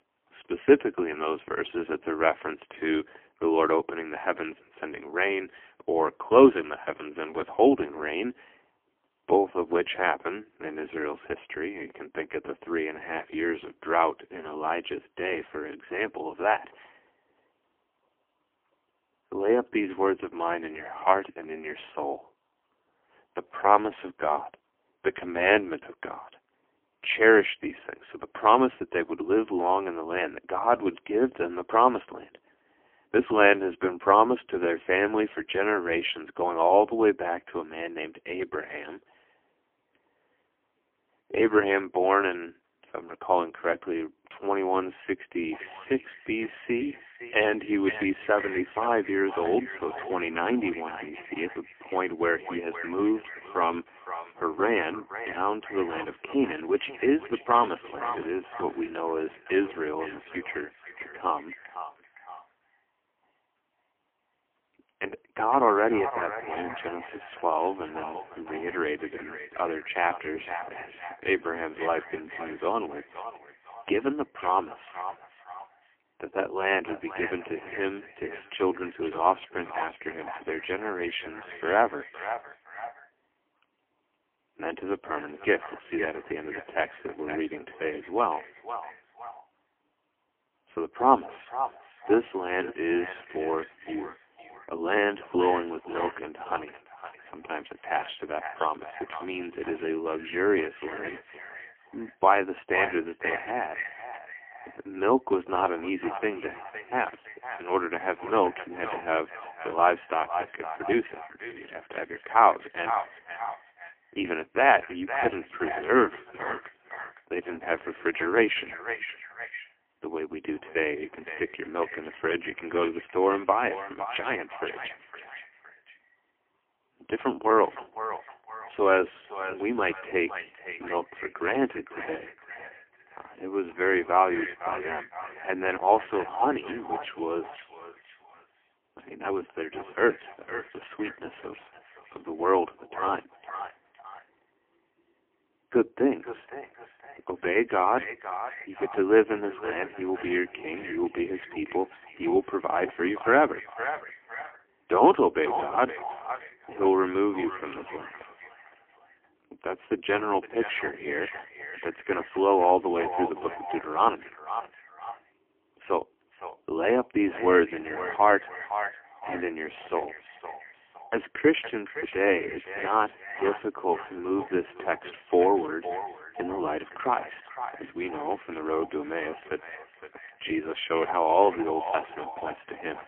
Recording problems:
phone-call audio; poor line; nothing above 3 kHz
echo of what is said; strong; from 46 s on; 510 ms later, 10 dB below the speech

